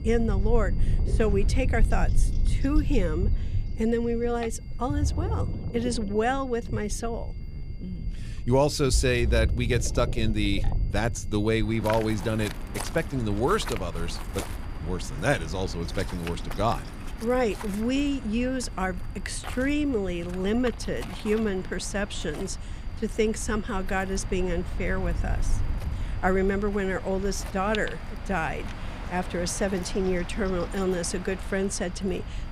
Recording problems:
rain or running water; loud; throughout; 10 dB below the speech
electrical hum; faint; throughout; 60 Hz, 30 dB below the speech
high-pitched whine; faint; throughout; 2 kHz, 30 dB below the speech
low rumble; faint; throughout; 20 dB below the speech

